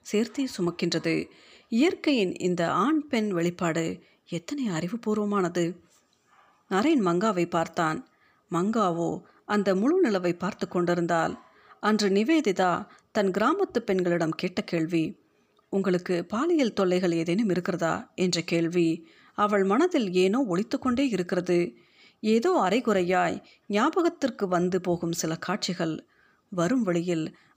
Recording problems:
none

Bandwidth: 15 kHz